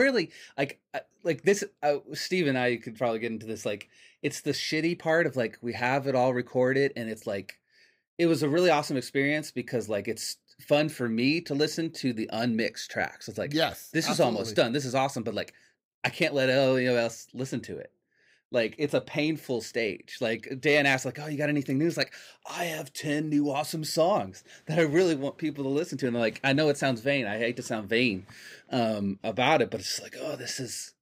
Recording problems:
abrupt cut into speech; at the start

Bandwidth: 15.5 kHz